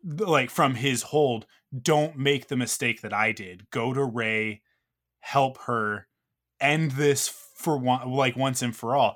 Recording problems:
none

